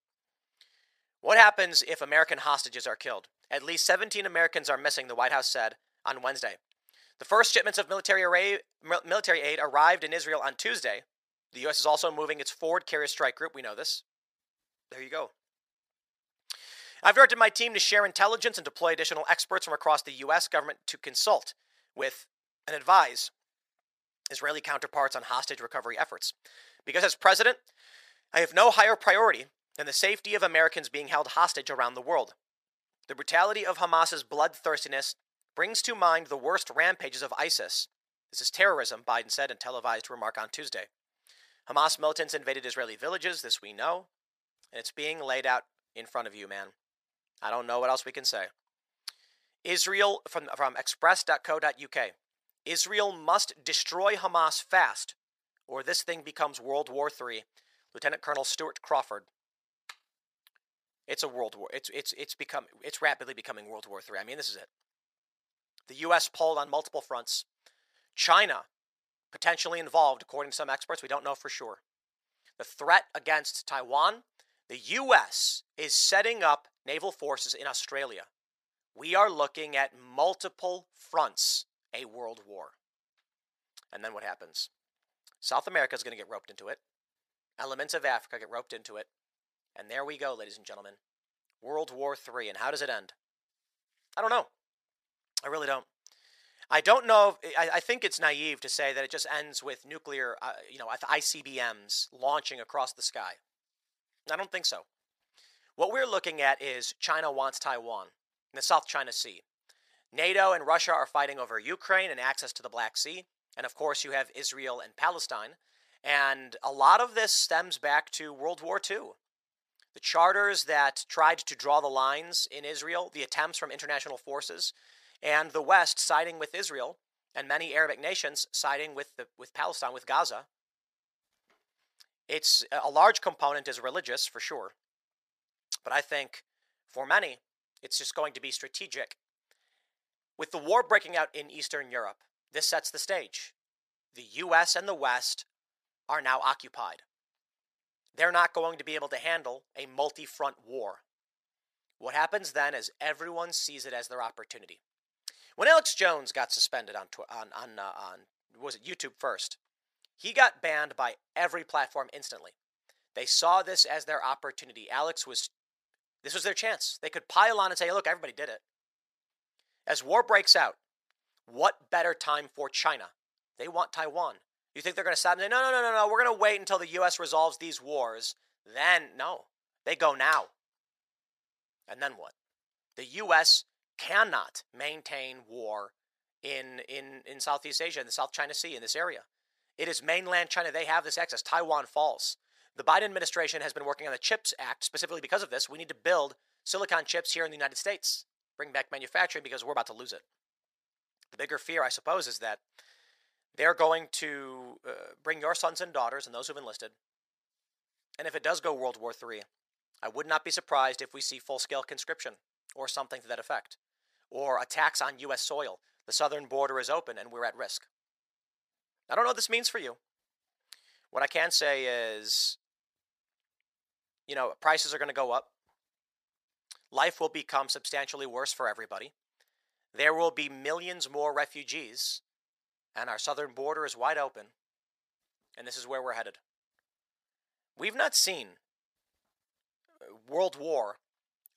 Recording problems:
thin; very; fading below 750 Hz

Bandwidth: 14.5 kHz